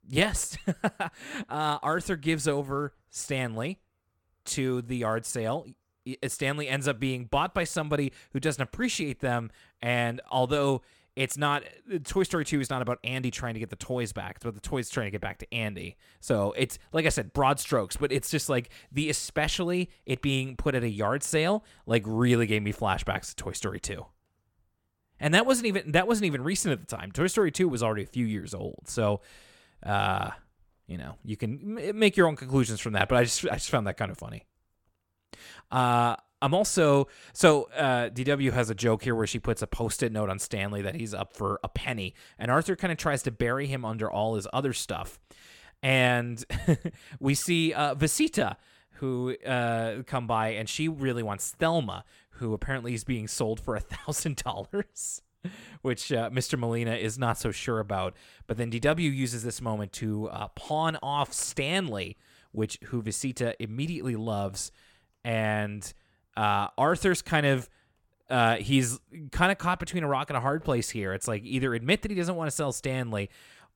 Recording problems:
none

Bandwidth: 17.5 kHz